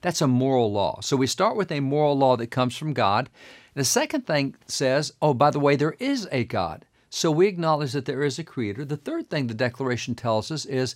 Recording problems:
none

